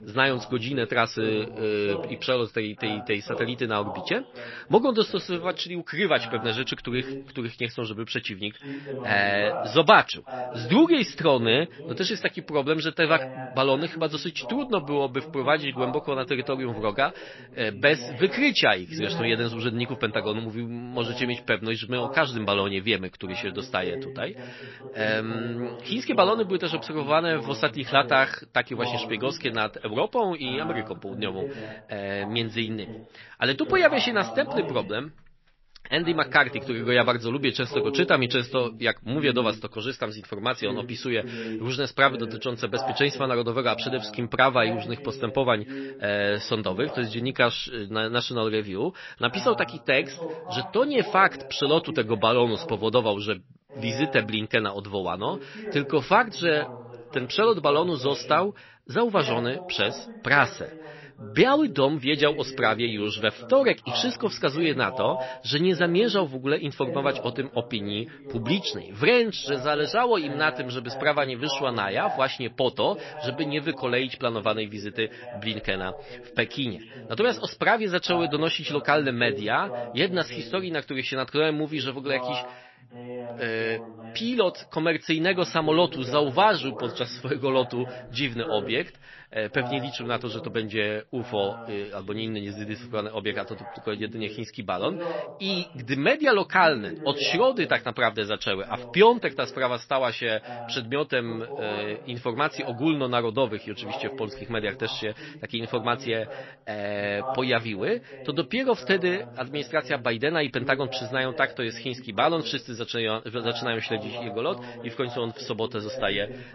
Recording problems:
garbled, watery; slightly; nothing above 5.5 kHz
voice in the background; noticeable; throughout; 15 dB below the speech

